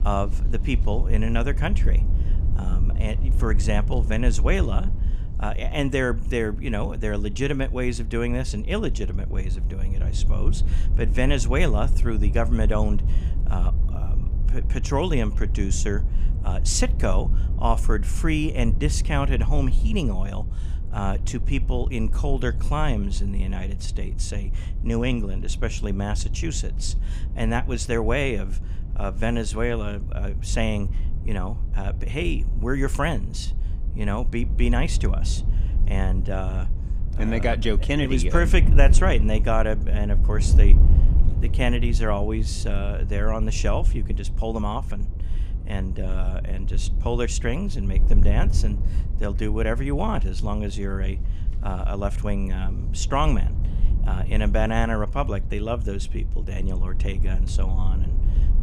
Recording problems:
wind noise on the microphone; occasional gusts; 15 dB below the speech

